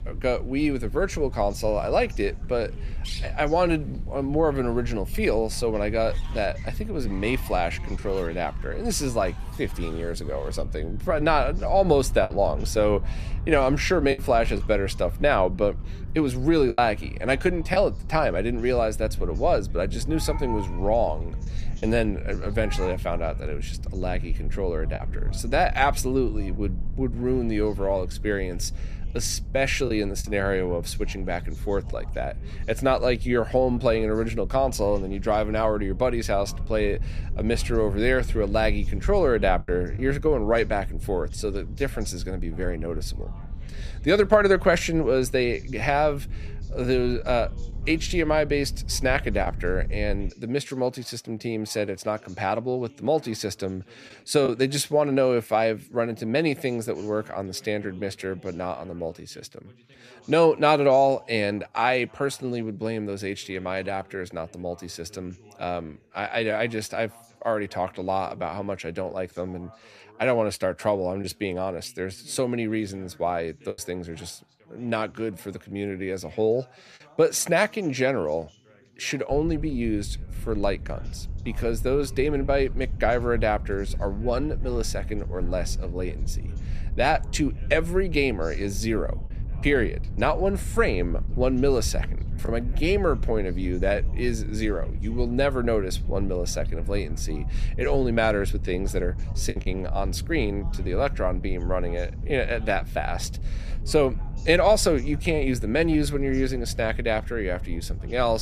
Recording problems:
animal sounds; faint; until 23 s; 20 dB below the speech
background chatter; faint; throughout; 2 voices, 30 dB below the speech
low rumble; faint; until 50 s and from 1:19 on; 25 dB below the speech
choppy; occasionally; 1% of the speech affected
abrupt cut into speech; at the end

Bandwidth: 14.5 kHz